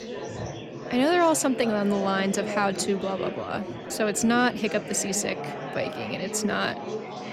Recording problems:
chatter from many people; loud; throughout; 9 dB below the speech

